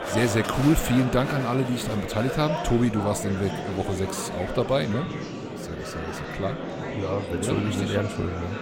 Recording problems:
murmuring crowd; loud; throughout; 5 dB below the speech

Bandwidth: 16.5 kHz